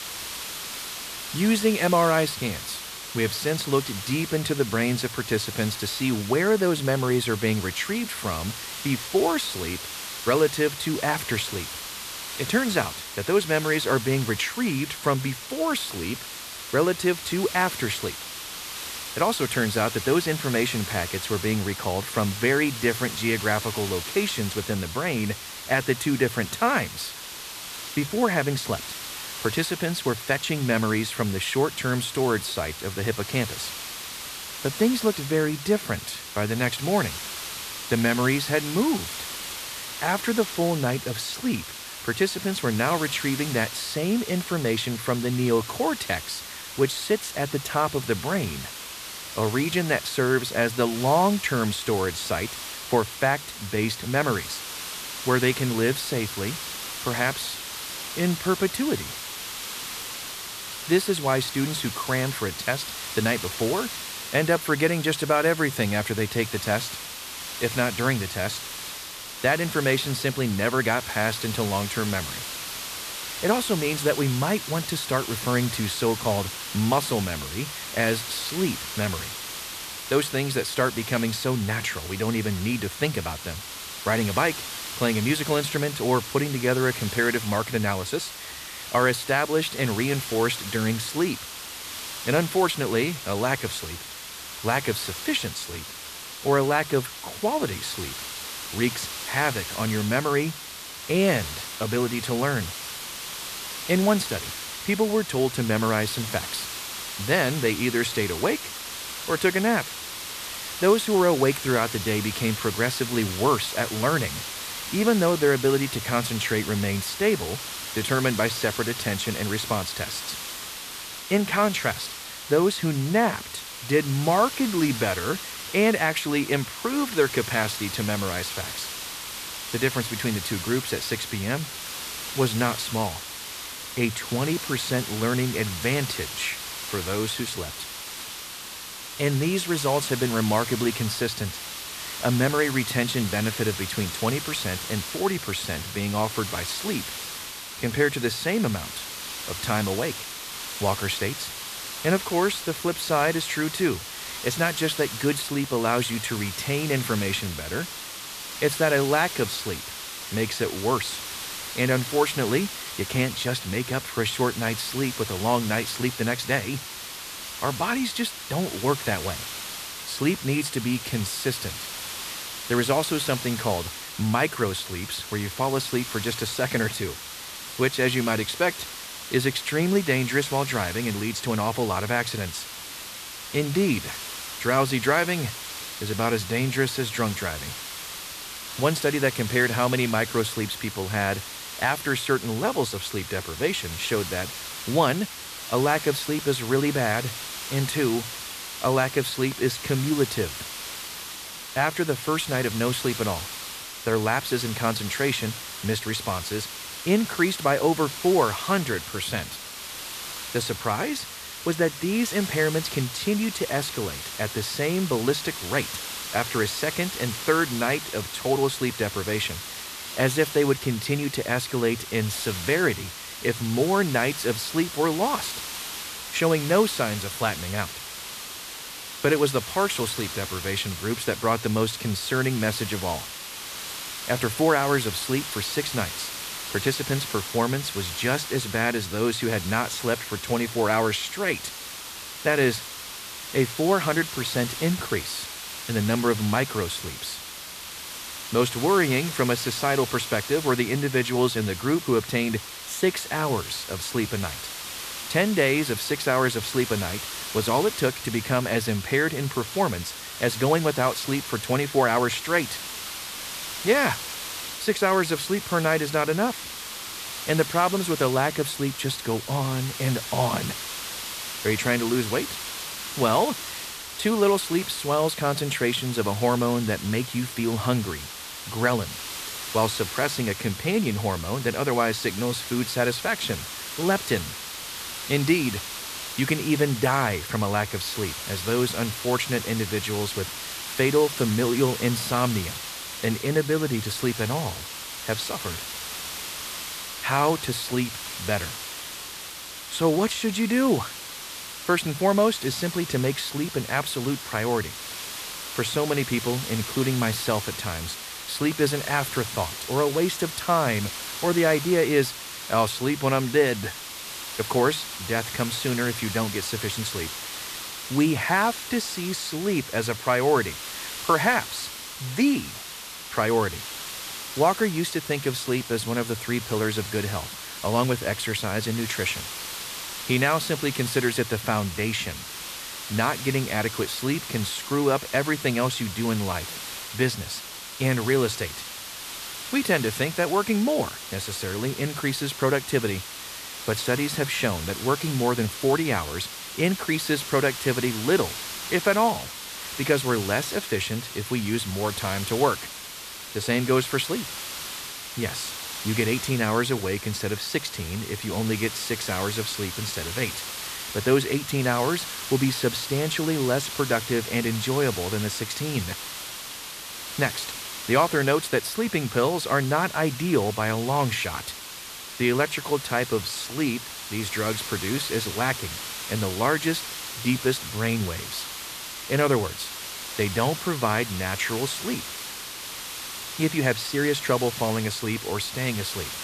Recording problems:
hiss; loud; throughout; 8 dB below the speech

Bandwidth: 14.5 kHz